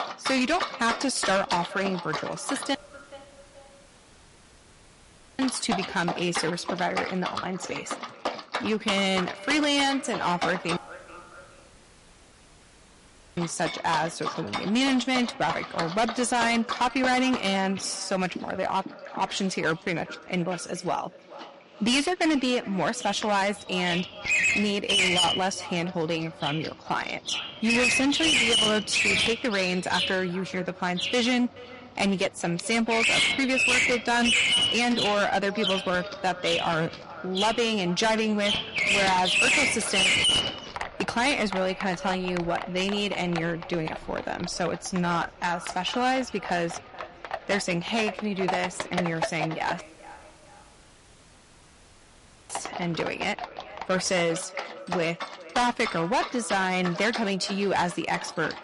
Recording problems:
distortion; heavy; 11% of the sound clipped
echo of what is said; noticeable; throughout; 430 ms later, 20 dB below the speech
garbled, watery; slightly; nothing above 11 kHz
animal sounds; loud; throughout; as loud as the speech
audio cutting out; at 3 s for 2.5 s, at 11 s for 2.5 s and at 50 s for 2.5 s

